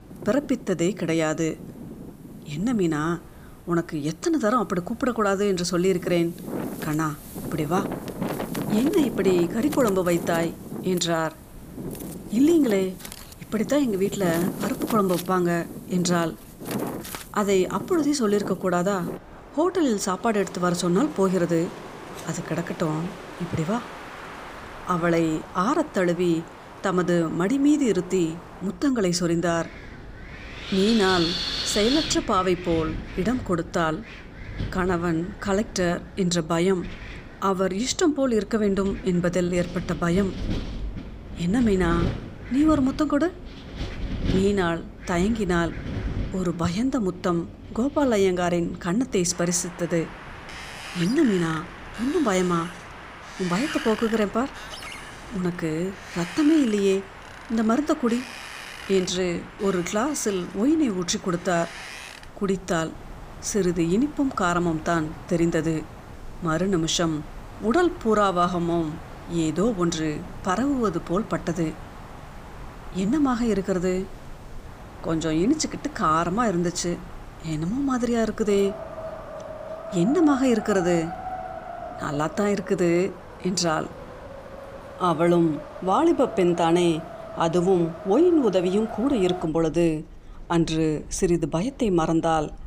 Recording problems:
wind in the background; noticeable; throughout; 10 dB below the speech

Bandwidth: 15 kHz